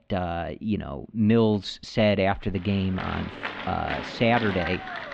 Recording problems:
muffled; slightly; fading above 3.5 kHz
crowd noise; loud; from 3 s on; 8 dB below the speech

